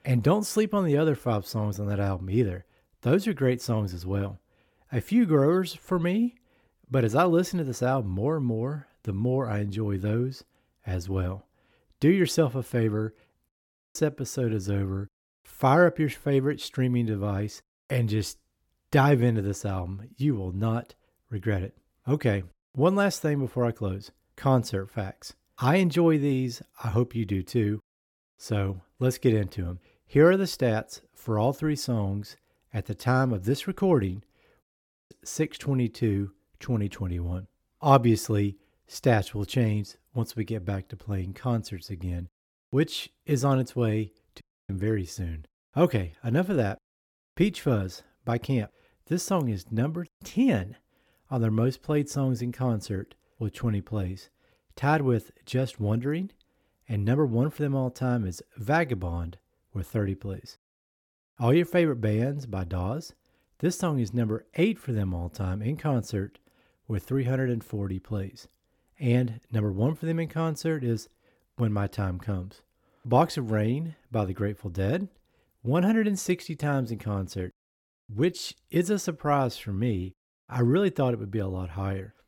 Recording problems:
audio cutting out; at 13 s, at 35 s and at 44 s

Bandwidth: 17 kHz